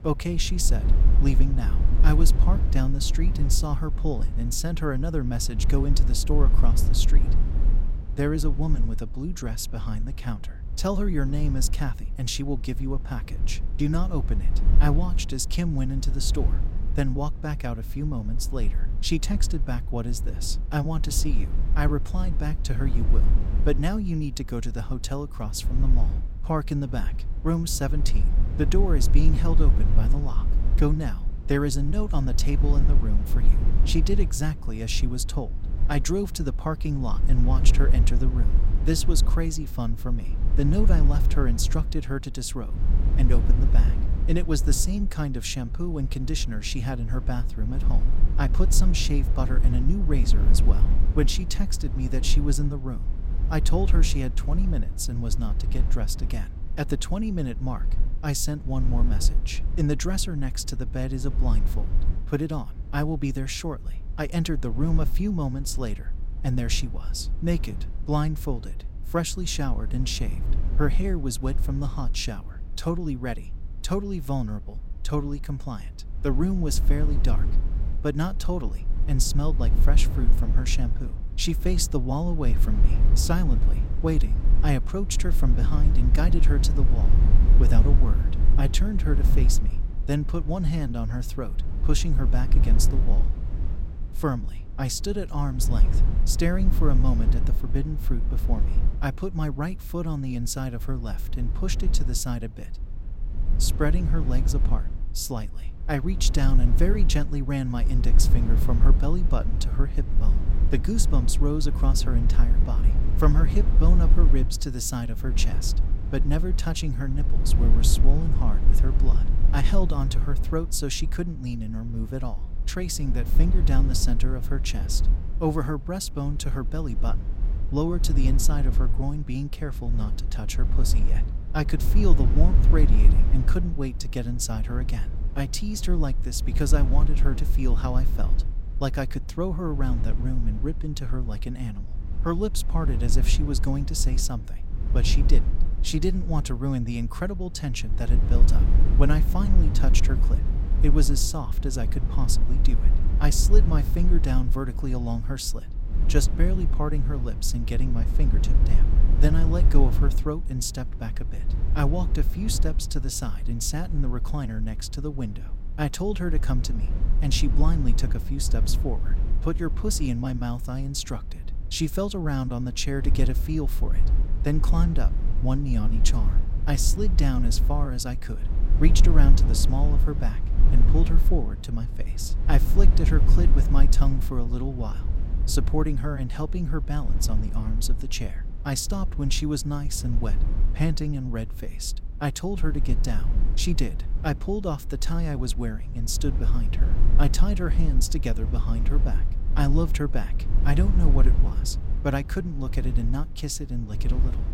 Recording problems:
low rumble; noticeable; throughout; 10 dB below the speech

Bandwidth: 16 kHz